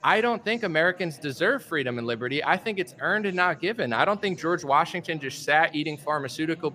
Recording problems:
background chatter; faint; throughout; 4 voices, 25 dB below the speech

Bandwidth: 15 kHz